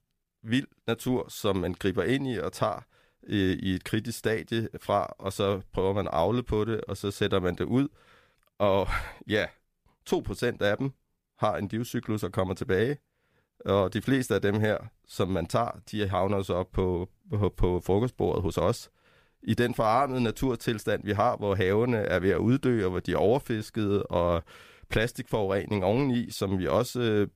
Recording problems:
none

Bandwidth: 15 kHz